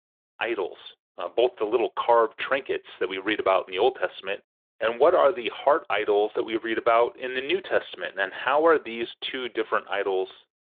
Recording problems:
phone-call audio

